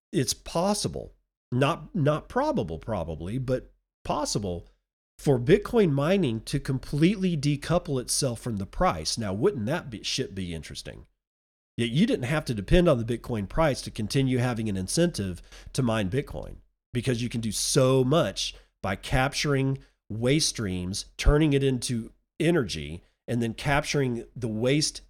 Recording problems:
none

